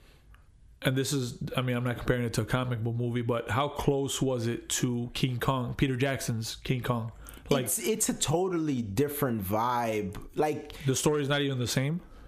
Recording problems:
squashed, flat; heavily

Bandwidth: 14.5 kHz